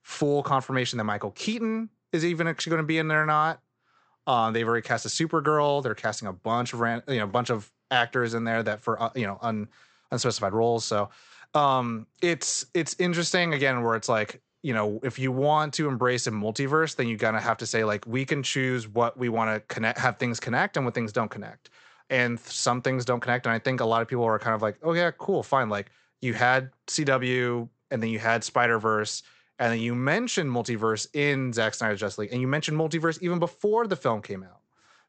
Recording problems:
high frequencies cut off; noticeable; nothing above 8 kHz

